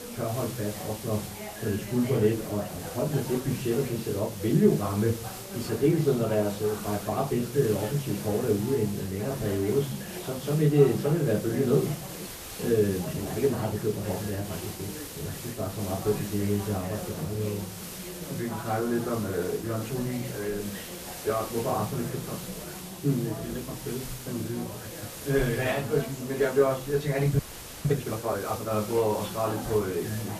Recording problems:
off-mic speech; far
room echo; very slight; dies away in 0.4 s
garbled, watery; slightly; nothing above 14.5 kHz
background chatter; noticeable; throughout; 4 voices, 10 dB below the speech
hiss; noticeable; throughout; 10 dB below the speech
audio freezing; at 12 s and at 27 s

